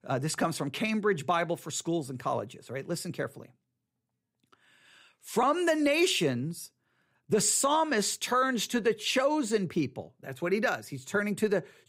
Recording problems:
none

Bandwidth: 15.5 kHz